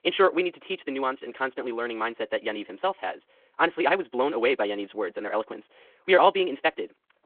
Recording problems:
wrong speed, natural pitch; too fast; 1.5 times normal speed
phone-call audio

